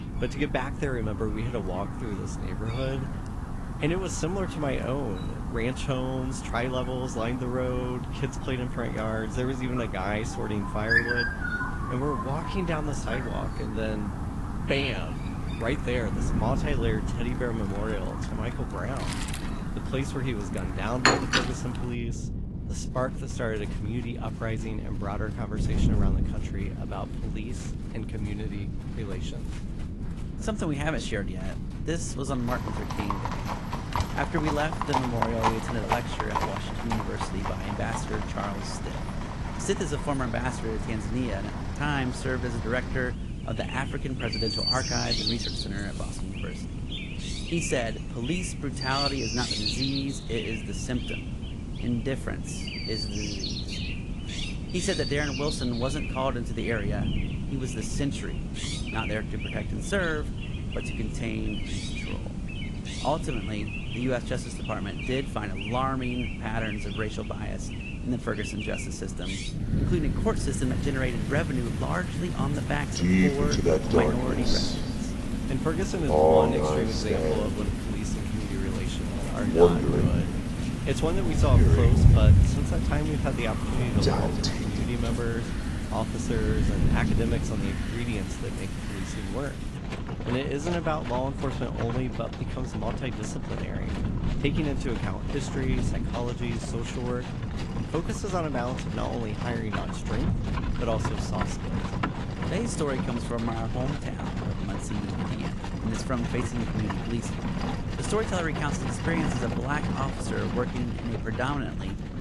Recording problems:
garbled, watery; slightly; nothing above 11 kHz
animal sounds; very loud; throughout; 1 dB above the speech
wind noise on the microphone; occasional gusts; 10 dB below the speech

